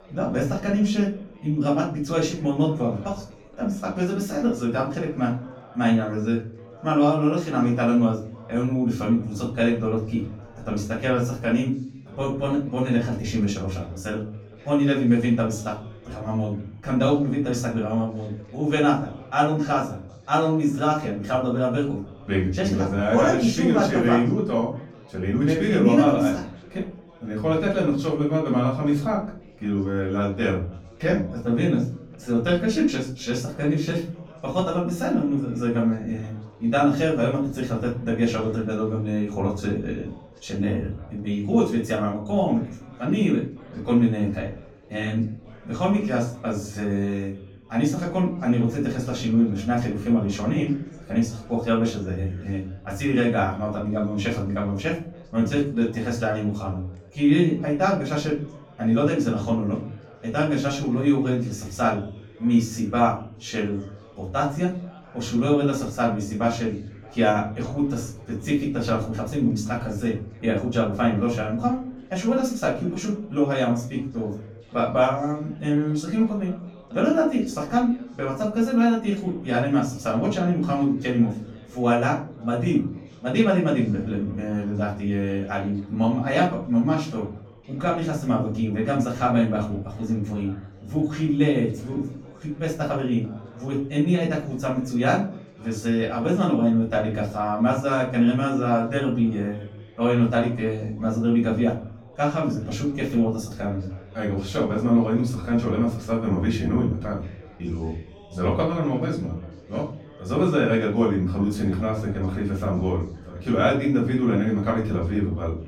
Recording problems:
off-mic speech; far
room echo; slight; dies away in 0.5 s
background chatter; faint; throughout; 4 voices, 25 dB below the speech

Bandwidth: 17.5 kHz